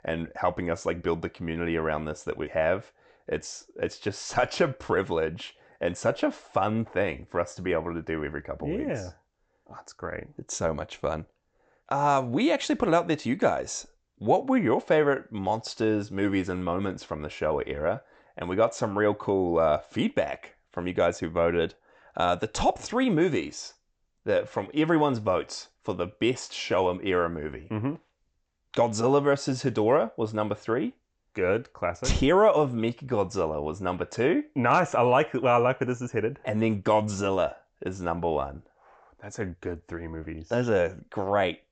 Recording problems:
high frequencies cut off; noticeable; nothing above 8 kHz

